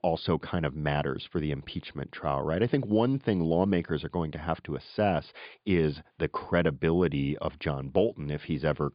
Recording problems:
high frequencies cut off; severe; nothing above 5 kHz

